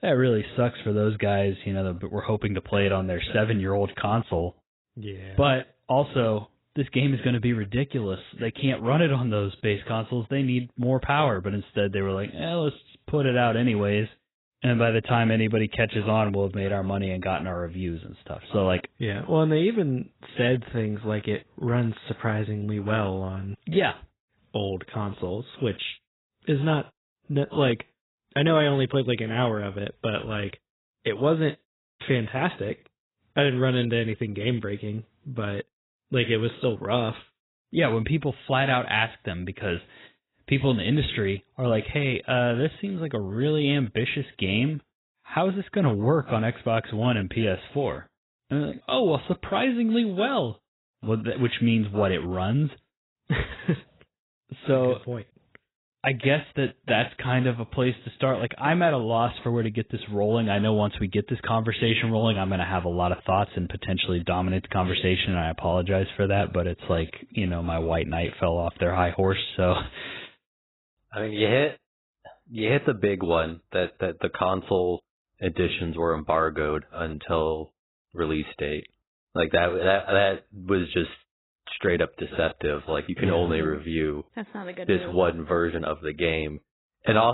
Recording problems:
garbled, watery; badly; nothing above 4 kHz
abrupt cut into speech; at the end

